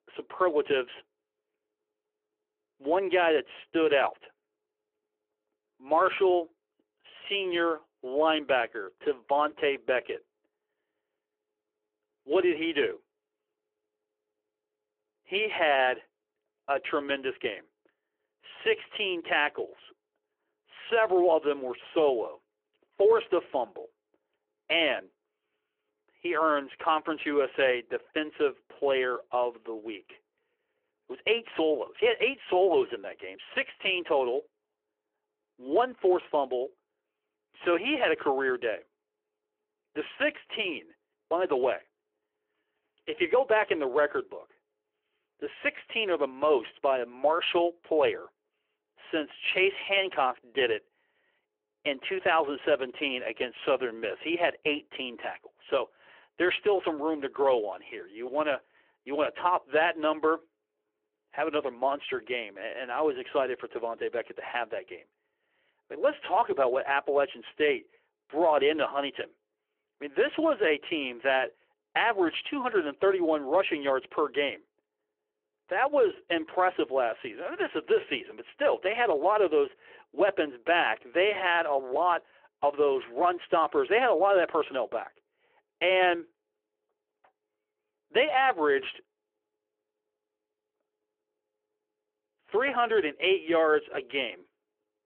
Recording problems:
phone-call audio

